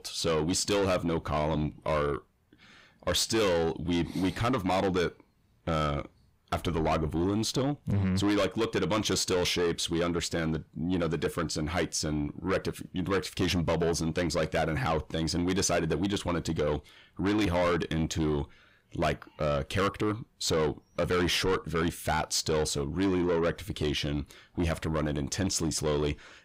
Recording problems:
distortion; heavy; 7 dB below the speech

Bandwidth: 15.5 kHz